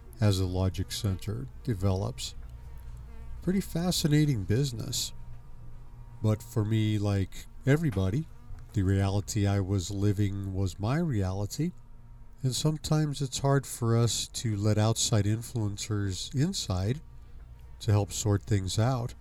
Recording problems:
electrical hum; faint; throughout; 50 Hz, 25 dB below the speech

